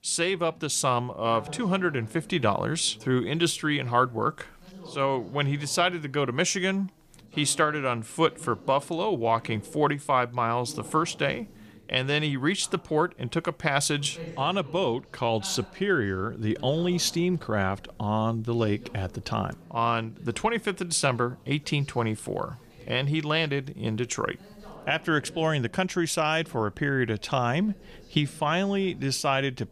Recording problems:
background chatter; faint; throughout; 2 voices, 20 dB below the speech

